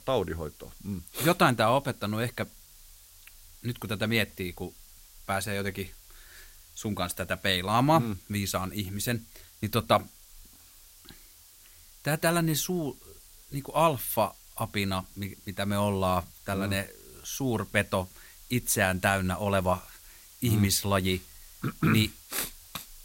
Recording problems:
hiss; faint; throughout; 20 dB below the speech

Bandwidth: 16 kHz